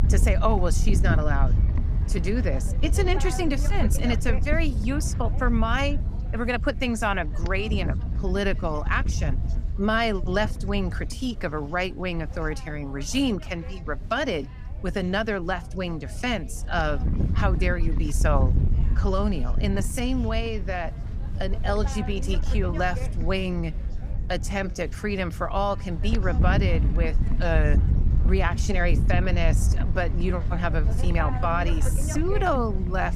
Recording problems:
wind noise on the microphone; occasional gusts; 10 dB below the speech
chatter from many people; faint; throughout; 25 dB below the speech

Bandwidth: 15.5 kHz